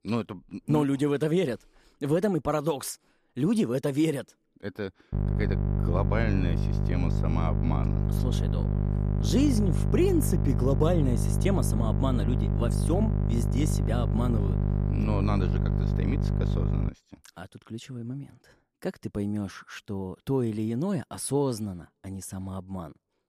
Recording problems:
electrical hum; loud; from 5 to 17 s; 50 Hz, 5 dB below the speech

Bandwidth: 14.5 kHz